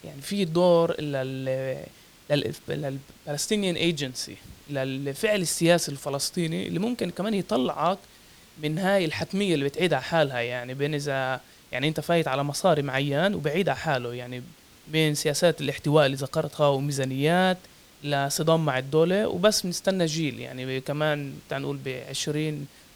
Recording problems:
hiss; faint; throughout; 25 dB below the speech

